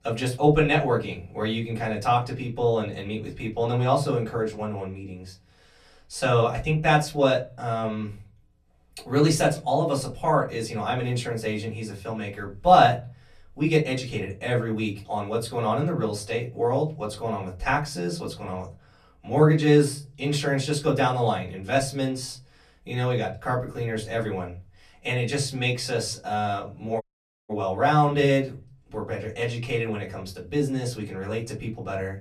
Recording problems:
off-mic speech; far
room echo; very slight; dies away in 0.3 s
audio cutting out; at 27 s

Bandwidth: 14 kHz